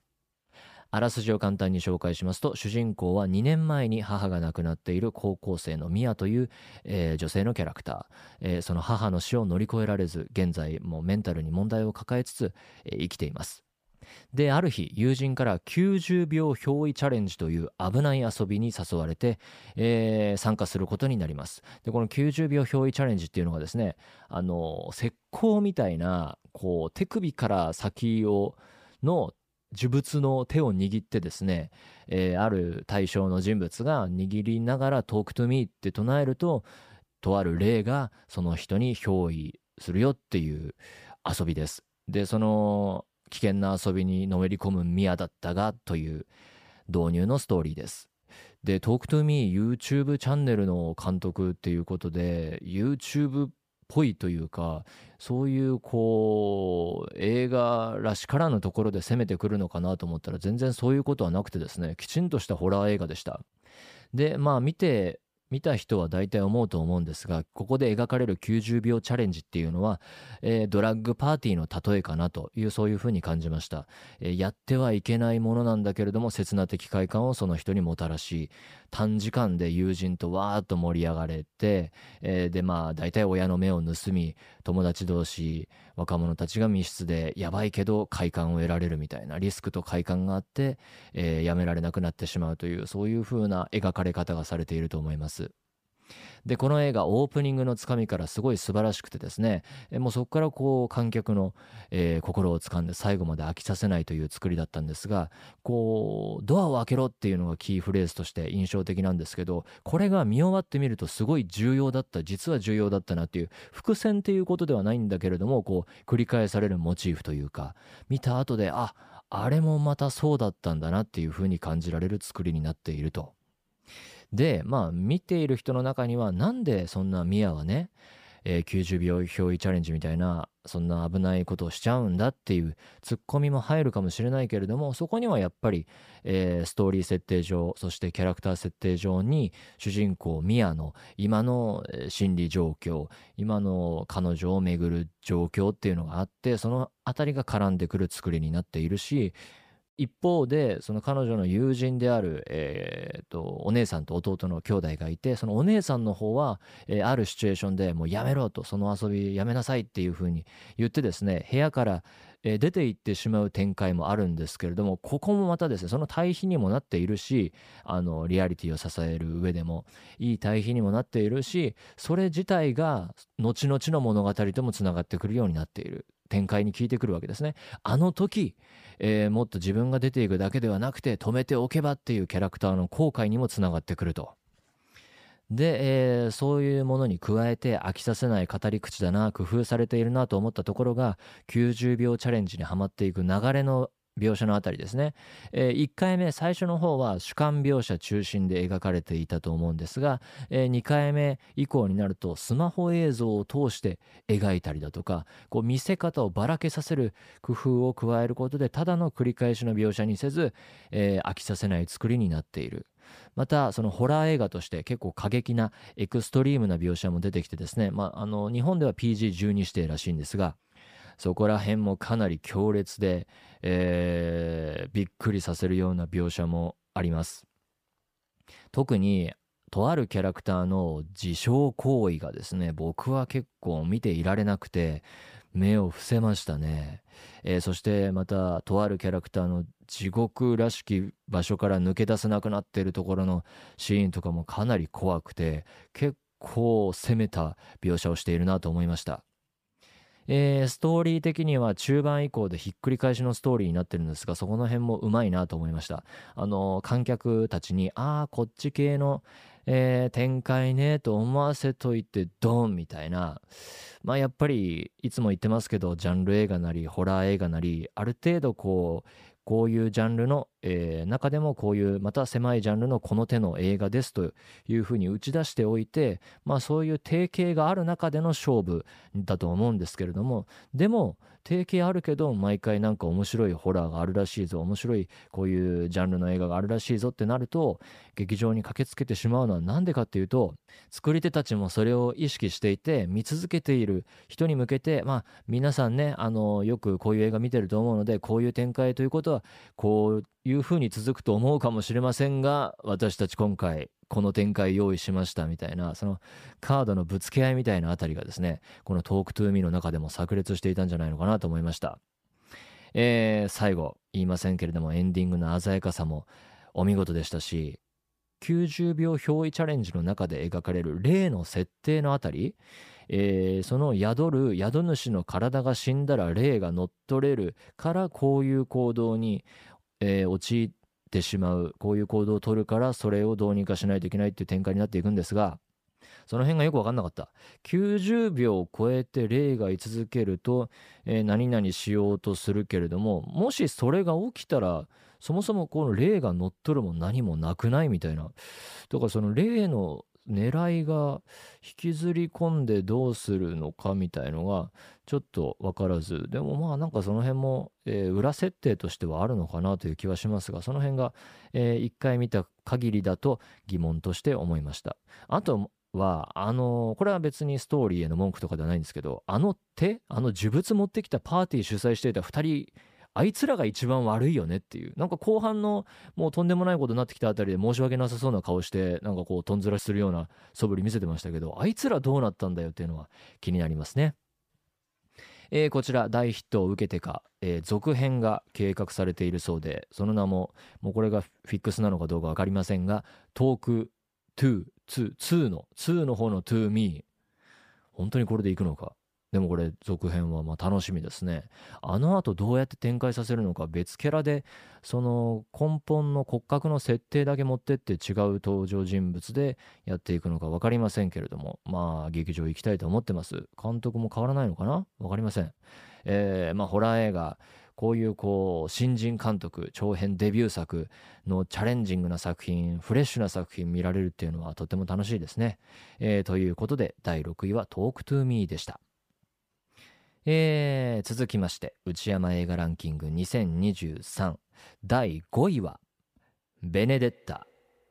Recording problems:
none

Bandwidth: 15 kHz